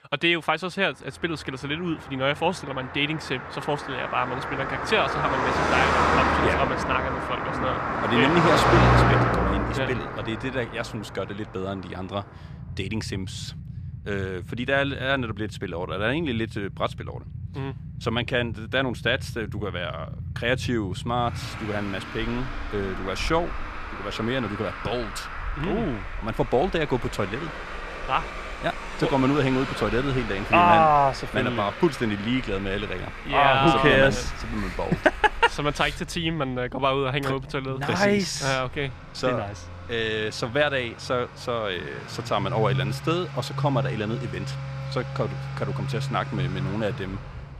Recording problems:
traffic noise; loud; throughout; 4 dB below the speech

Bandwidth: 14.5 kHz